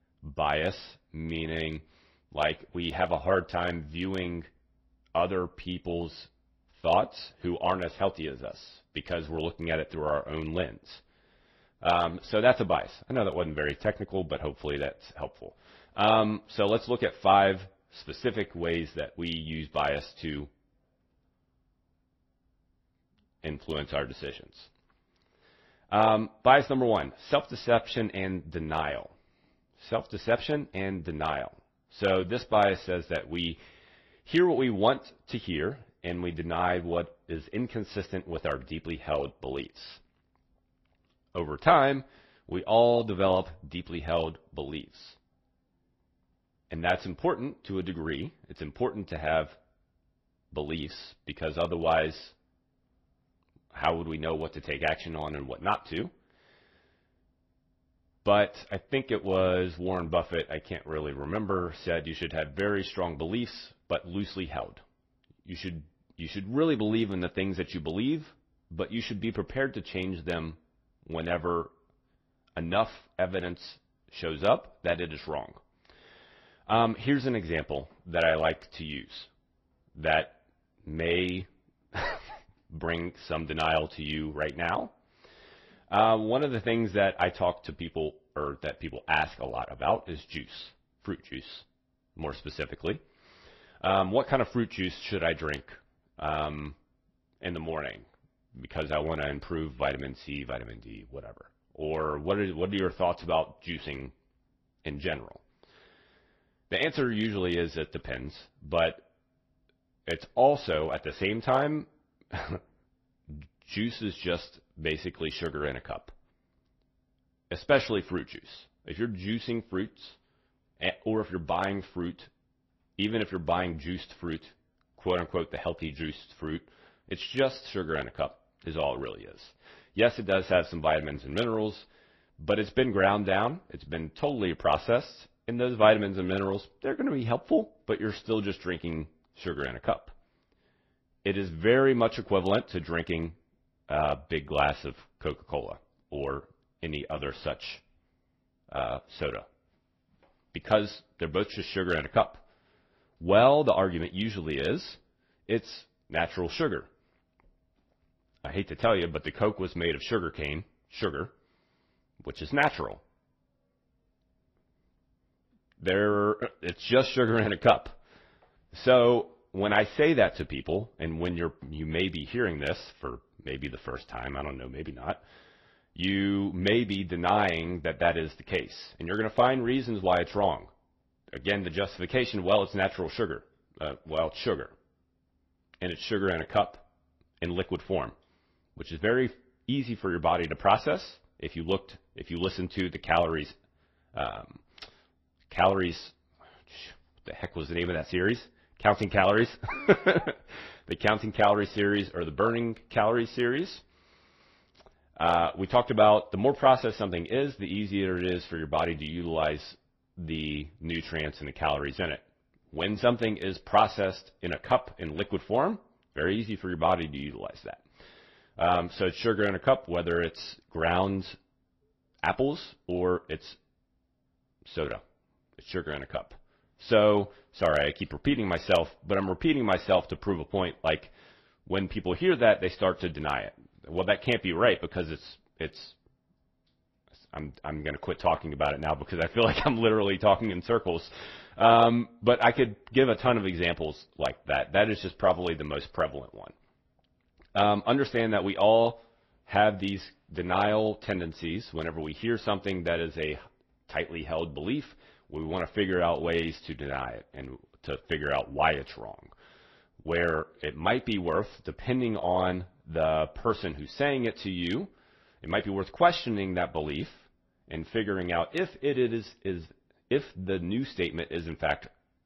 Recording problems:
garbled, watery; slightly

